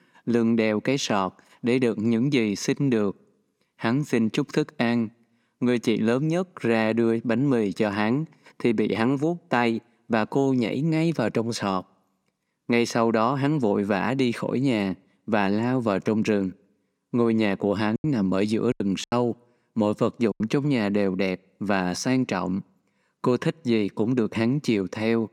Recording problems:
choppy; very; from 18 to 20 s; 15% of the speech affected

